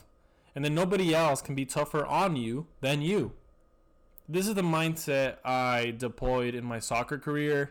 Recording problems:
distortion; slight; 7% of the sound clipped

